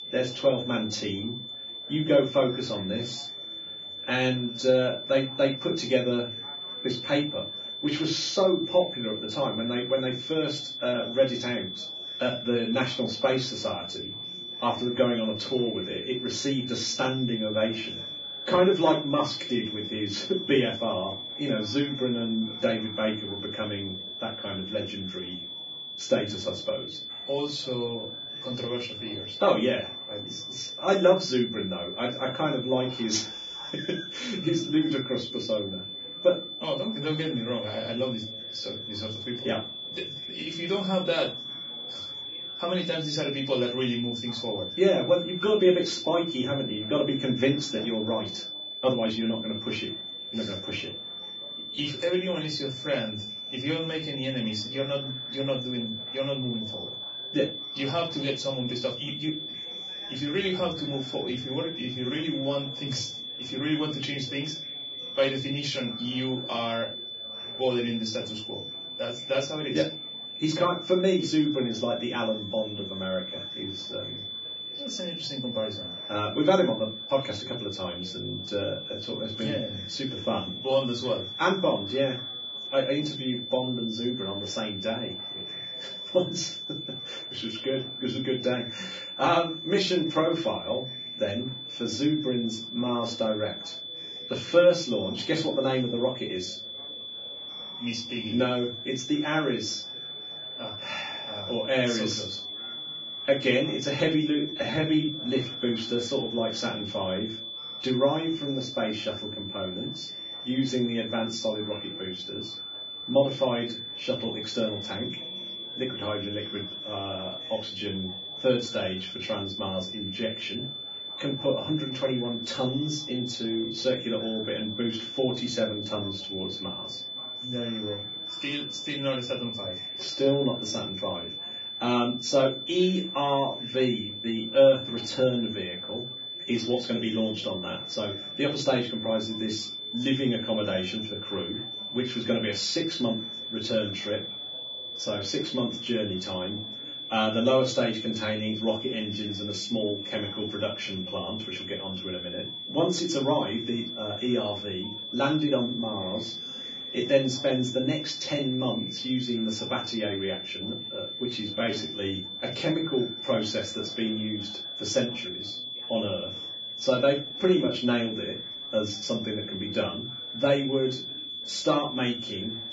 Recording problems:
off-mic speech; far
garbled, watery; badly
room echo; very slight; dies away in 0.3 s
high-pitched whine; loud; throughout; 3.5 kHz, 6 dB below the speech
chatter from many people; faint; throughout; 25 dB below the speech
uneven, jittery; strongly; from 12 s to 2:48

